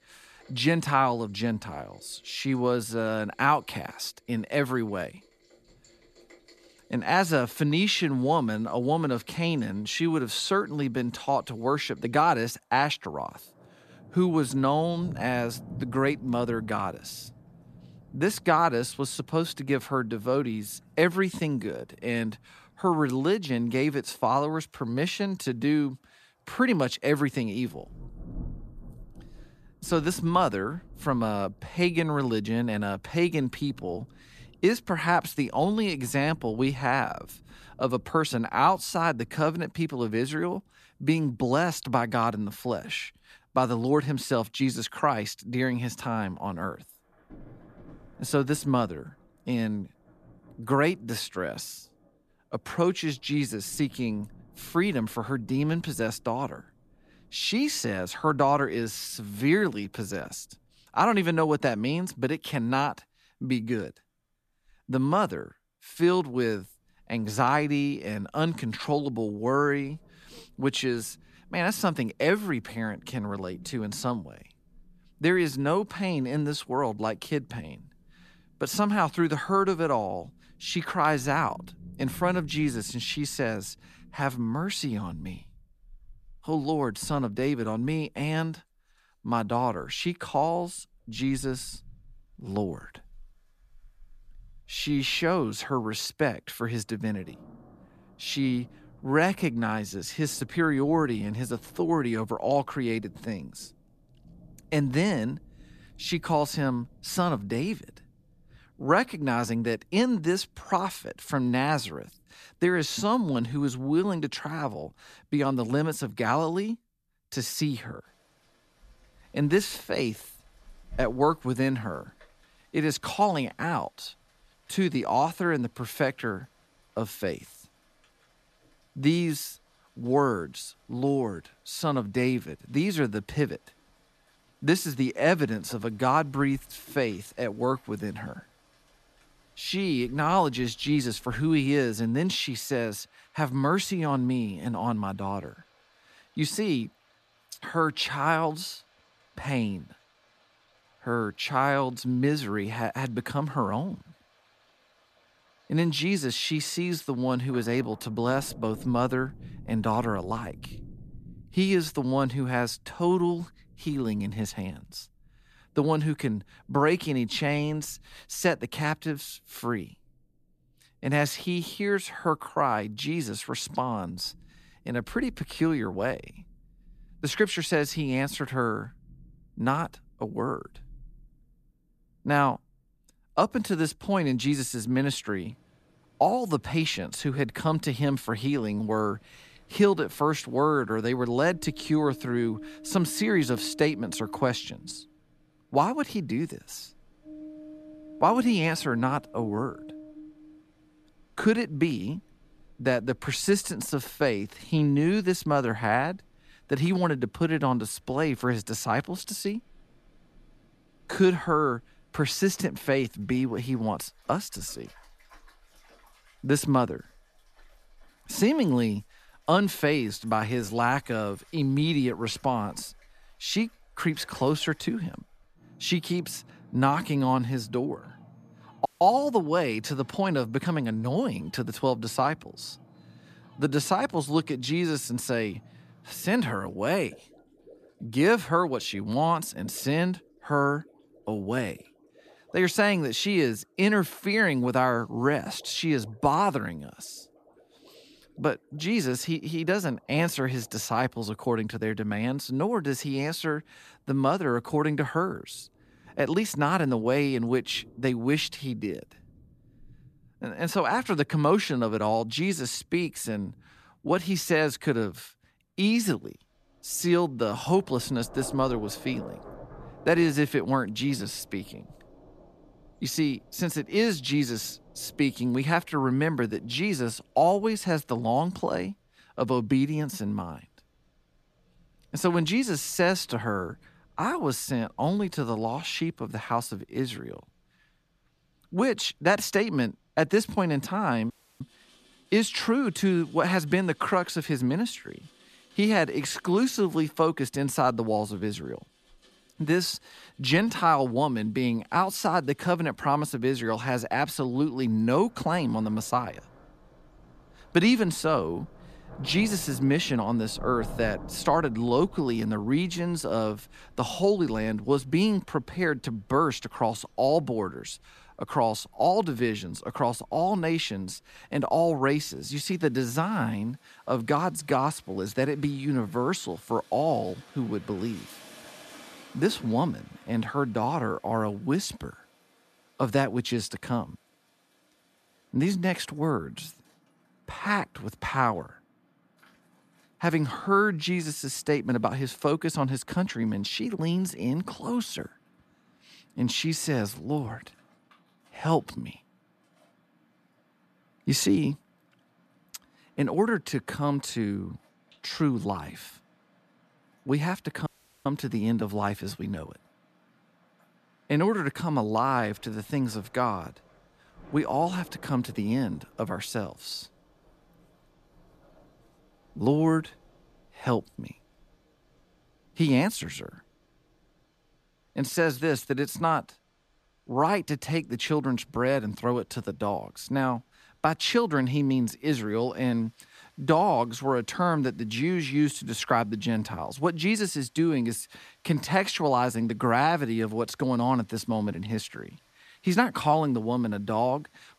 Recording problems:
rain or running water; faint; throughout; 25 dB below the speech
audio cutting out; at 3:49, at 4:51 and at 5:58

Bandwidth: 14.5 kHz